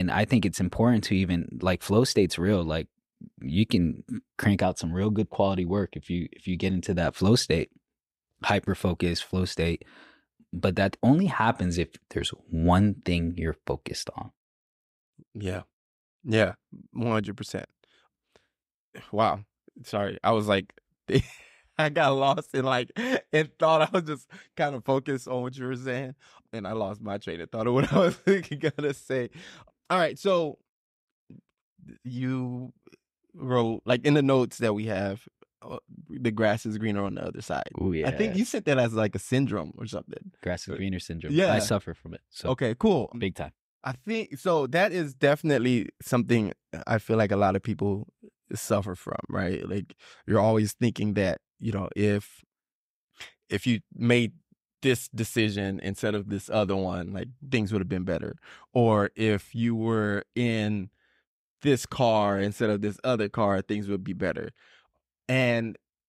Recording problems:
abrupt cut into speech; at the start

